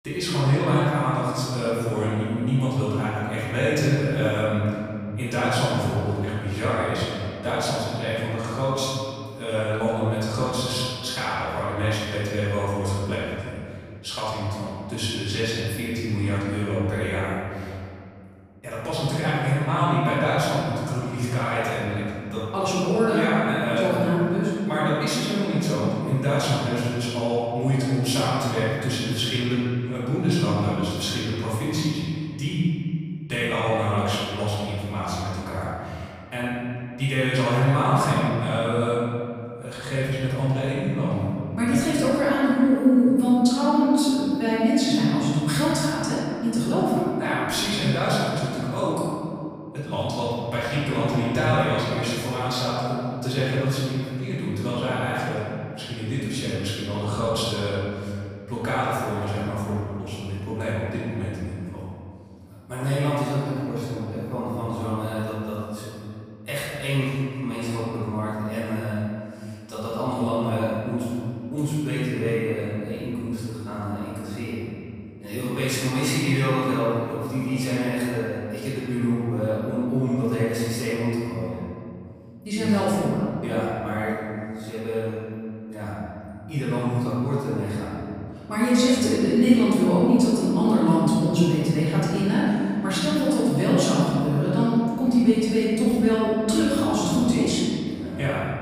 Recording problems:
room echo; strong; dies away in 2.4 s
off-mic speech; far

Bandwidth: 15 kHz